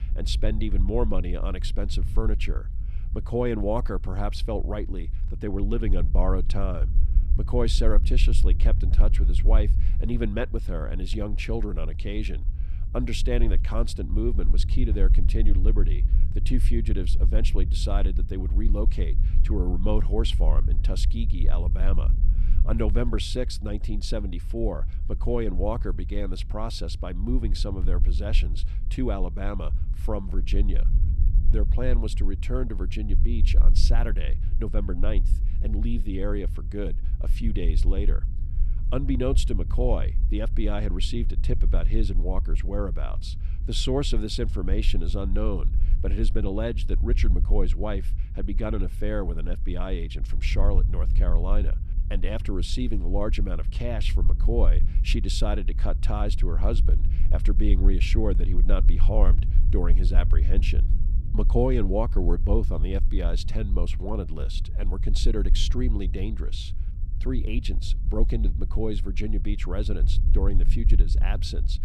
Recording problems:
low rumble; noticeable; throughout; 15 dB below the speech

